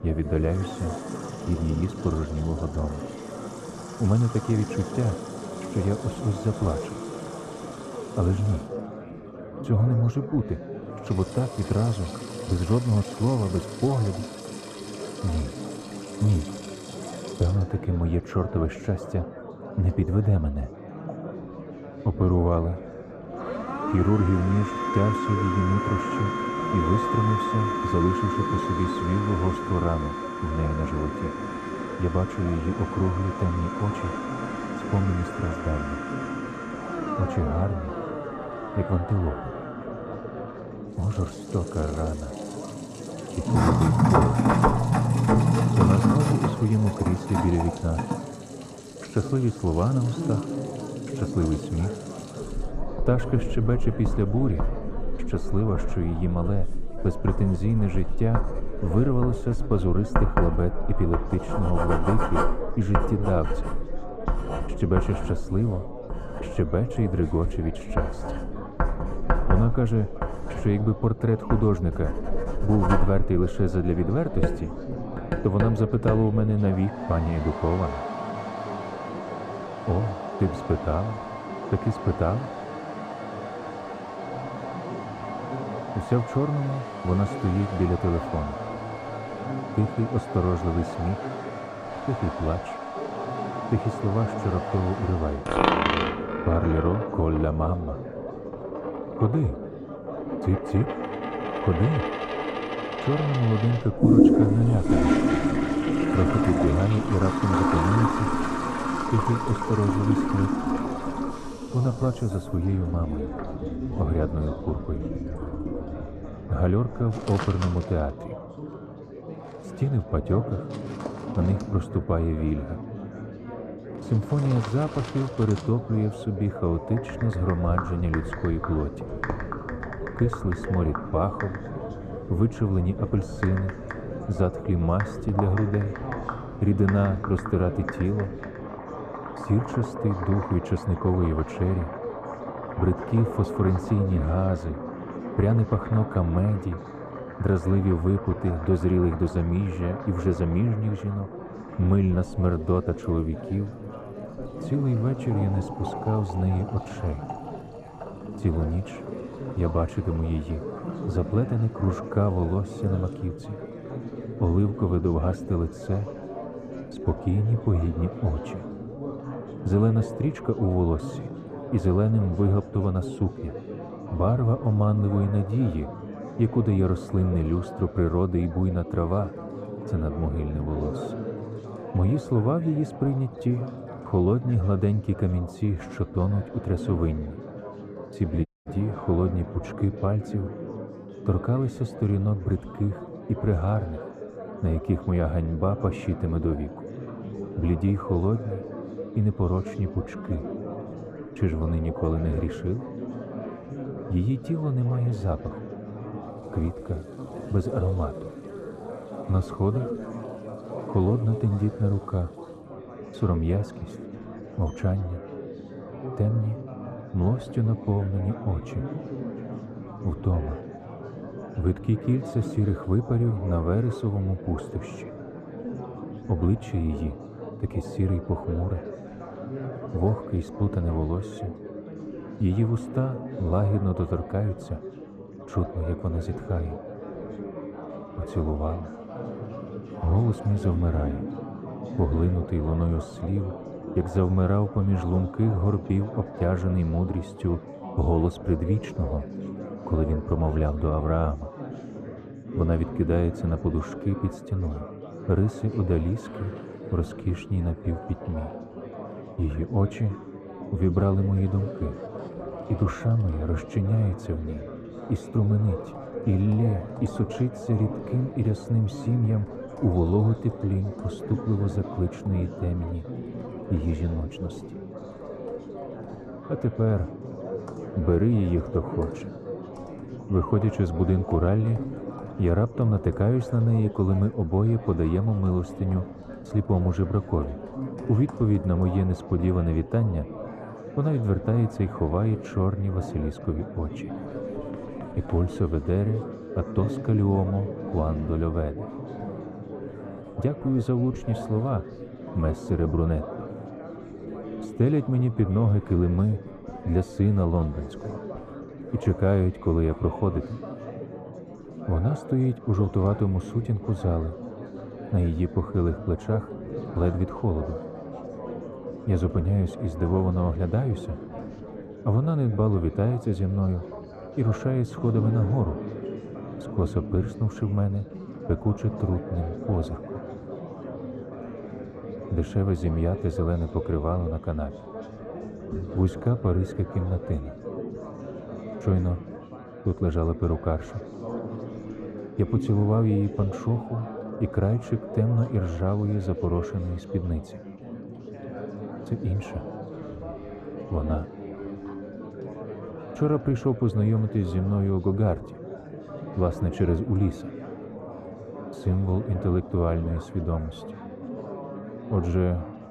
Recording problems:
muffled; very; fading above 1.5 kHz
household noises; loud; throughout; 5 dB below the speech
chatter from many people; noticeable; throughout; 10 dB below the speech
audio cutting out; at 3:08

